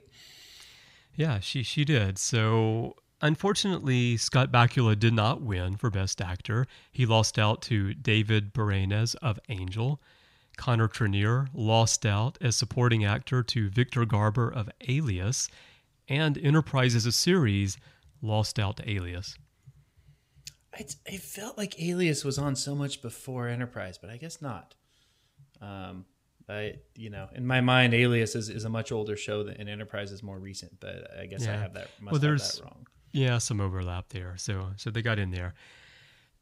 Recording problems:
none

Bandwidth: 15.5 kHz